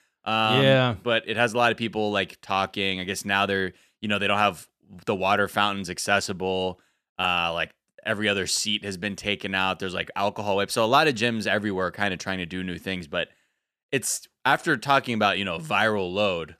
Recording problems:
none

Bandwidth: 14 kHz